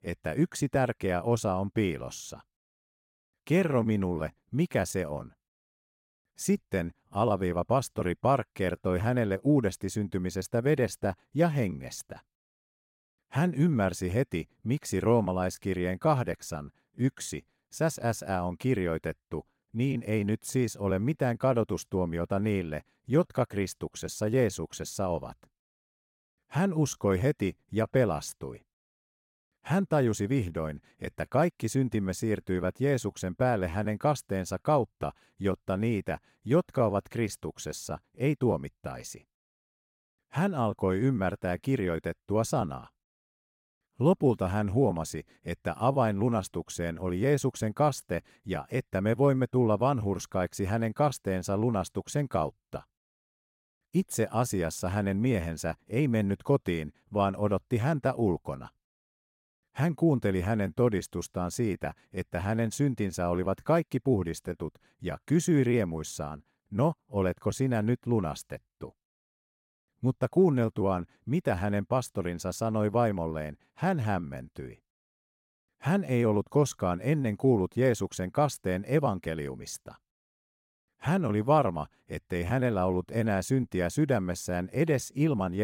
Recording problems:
abrupt cut into speech; at the end

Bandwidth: 16 kHz